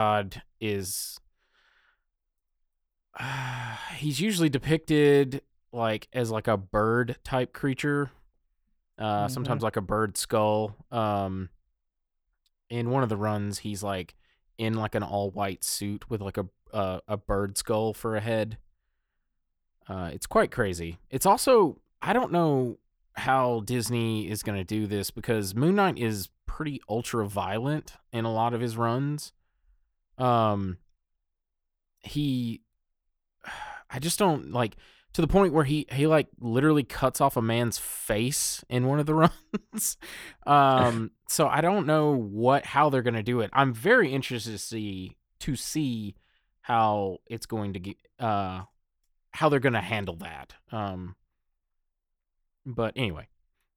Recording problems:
abrupt cut into speech; at the start

